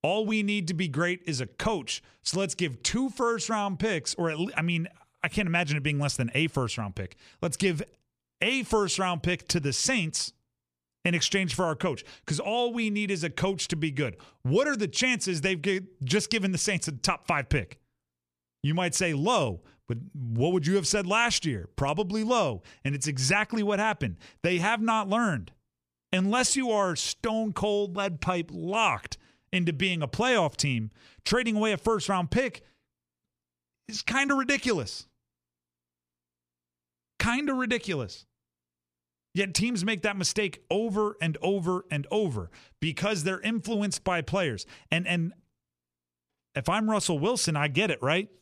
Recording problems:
none

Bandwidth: 14.5 kHz